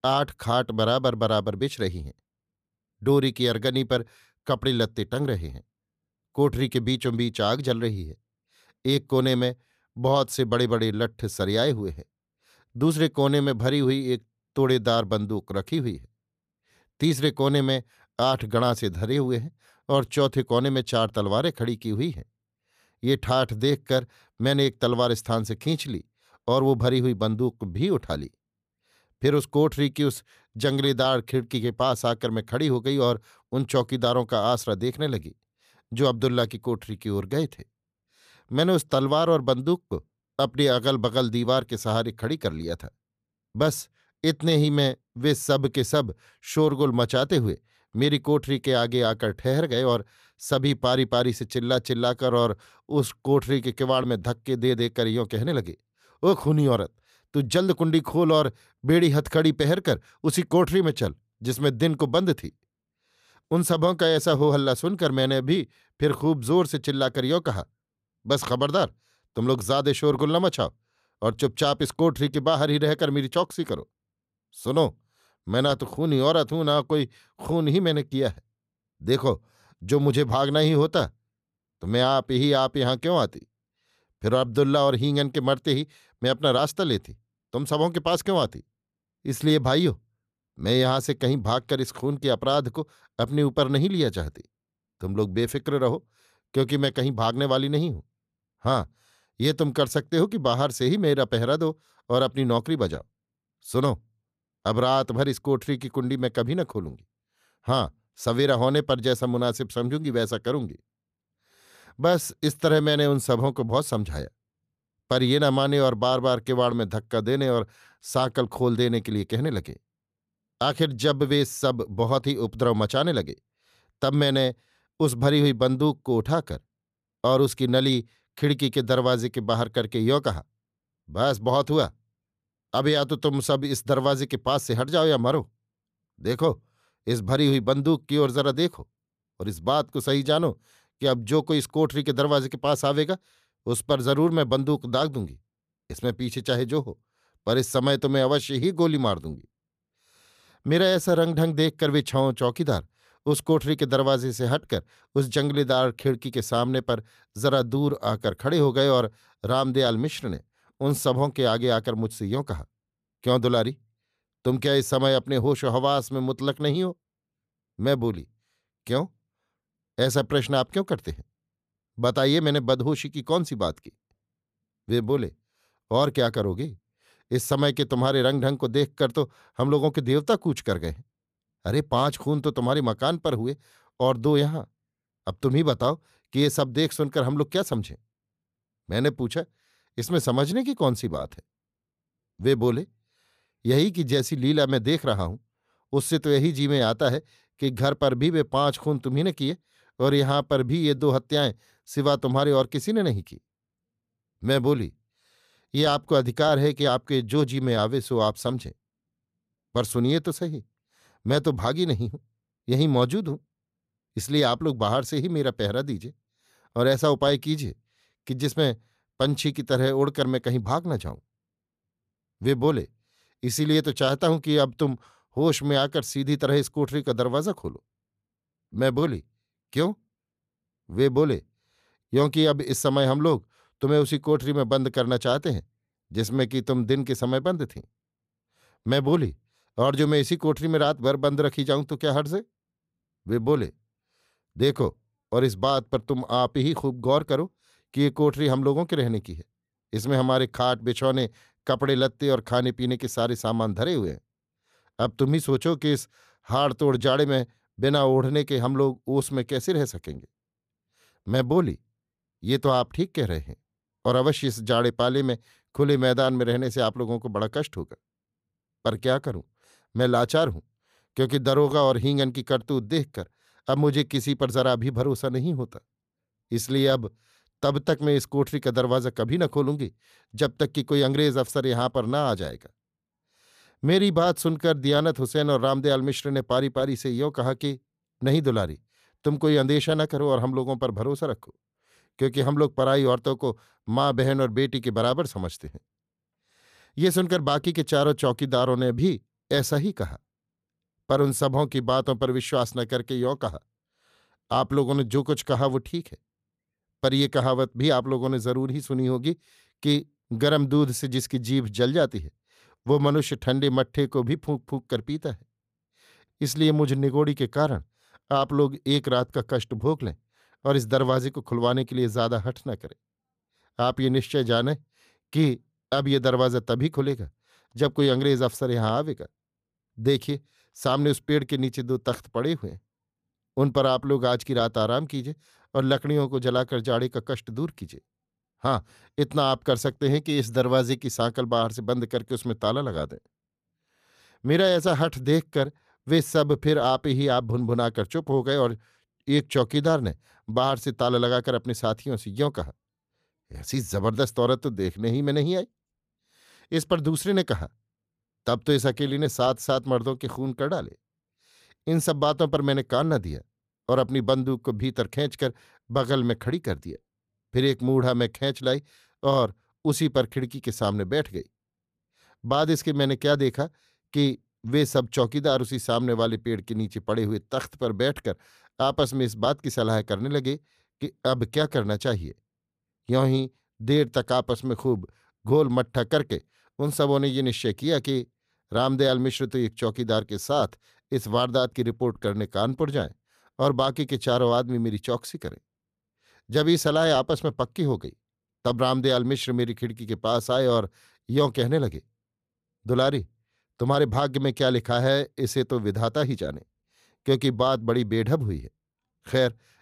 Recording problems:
none

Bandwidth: 14.5 kHz